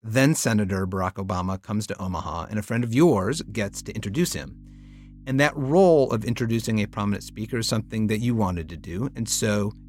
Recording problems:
electrical hum; faint; from 3.5 s on; 50 Hz, 30 dB below the speech

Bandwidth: 16 kHz